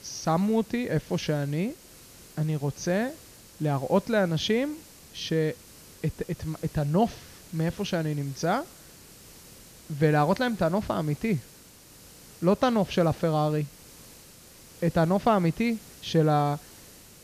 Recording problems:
high frequencies cut off; noticeable; nothing above 6.5 kHz
hiss; faint; throughout; 20 dB below the speech

